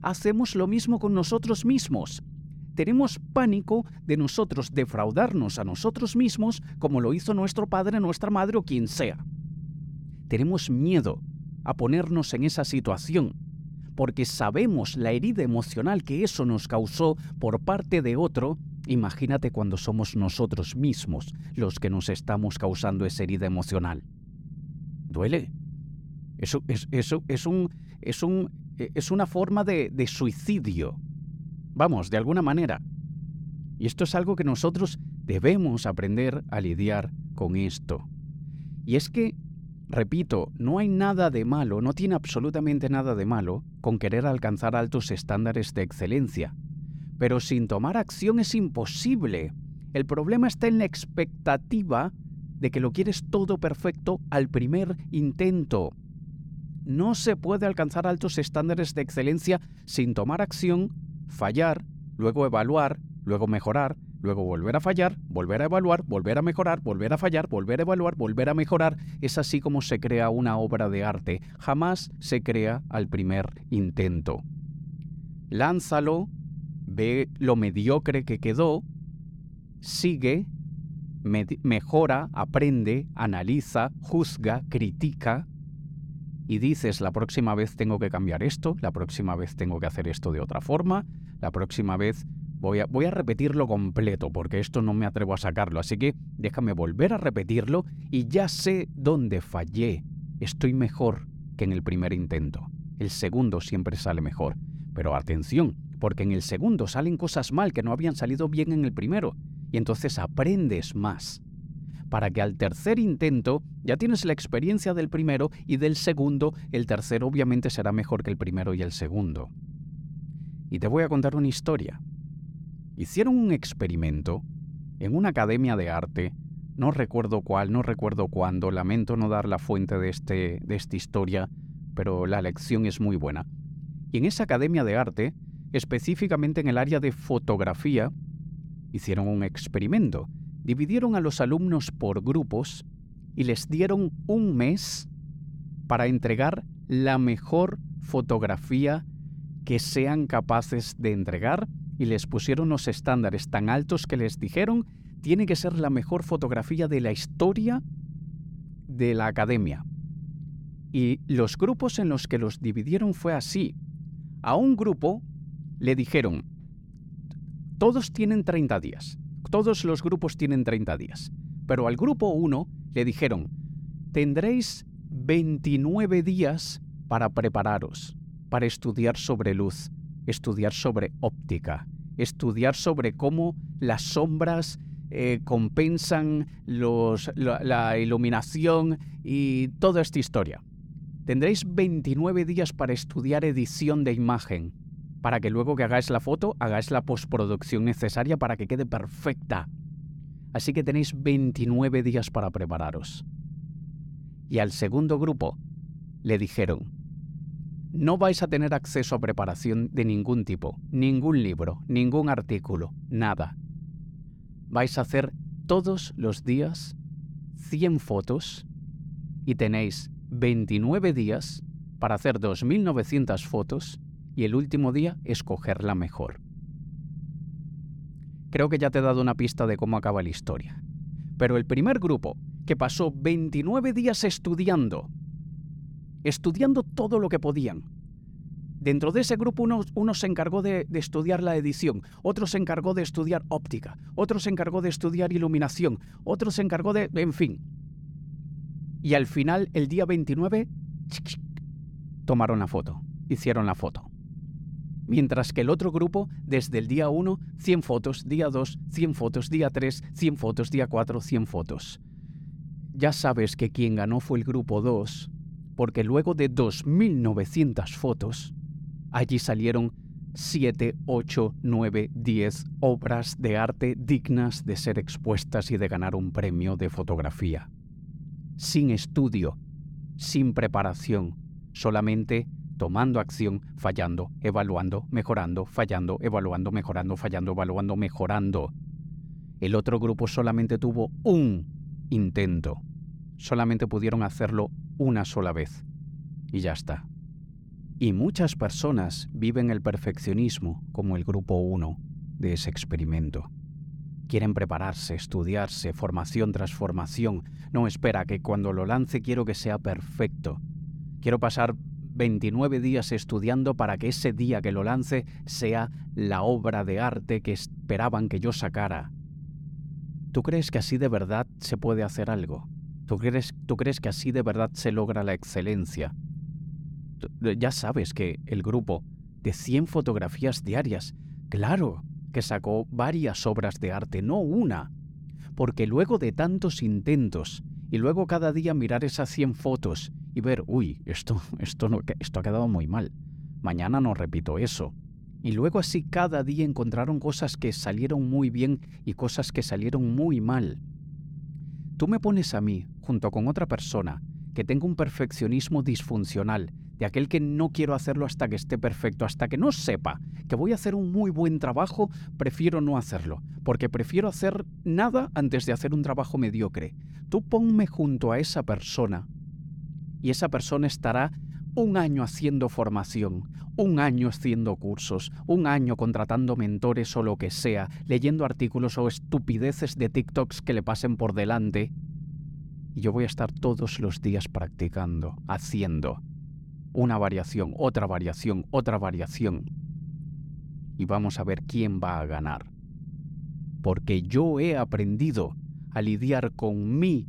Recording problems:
low rumble; faint; throughout; 20 dB below the speech

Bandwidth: 17.5 kHz